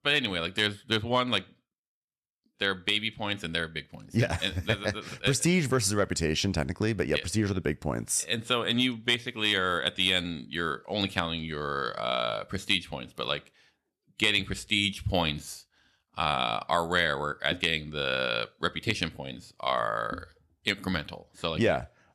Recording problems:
none

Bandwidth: 13.5 kHz